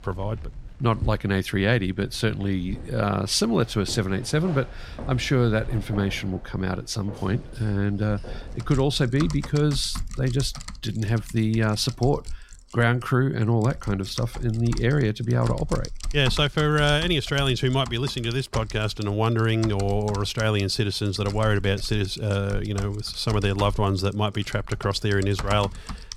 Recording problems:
household noises; noticeable; throughout; 15 dB below the speech

